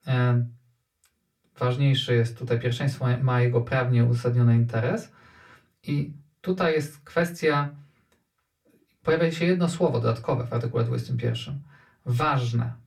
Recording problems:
off-mic speech; far
room echo; very slight; dies away in 0.2 s

